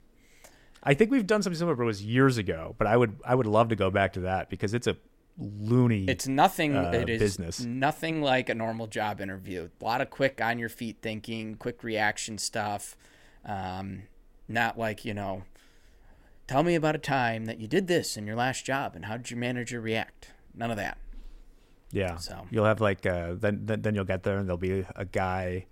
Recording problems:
none

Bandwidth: 16 kHz